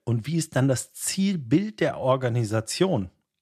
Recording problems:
none

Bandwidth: 14 kHz